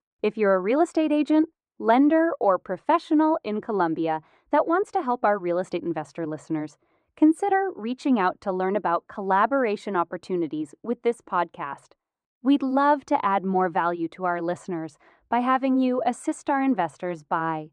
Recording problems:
muffled; very; fading above 2 kHz

